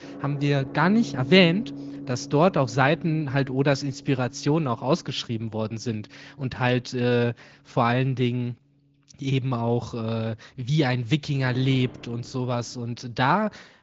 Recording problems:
high frequencies cut off; noticeable; nothing above 7 kHz
garbled, watery; slightly
background music; noticeable; throughout; 15 dB below the speech

